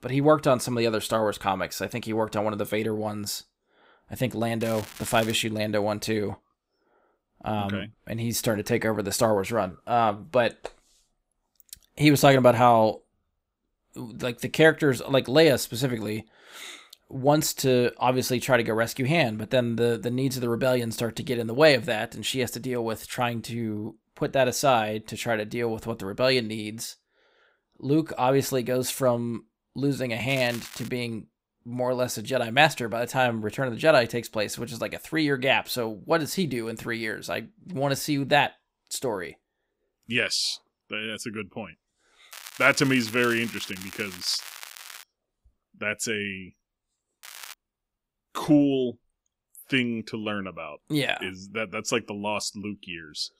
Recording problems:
crackling; noticeable; 4 times, first at 4.5 s; 15 dB below the speech

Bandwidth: 15.5 kHz